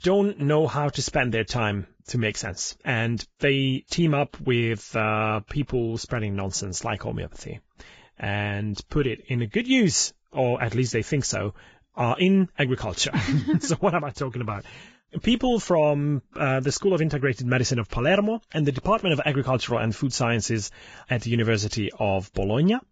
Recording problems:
garbled, watery; badly; nothing above 7.5 kHz

